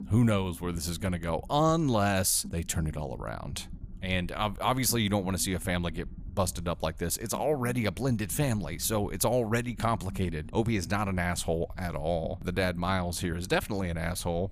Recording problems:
low rumble; faint; throughout; 25 dB below the speech

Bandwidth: 15 kHz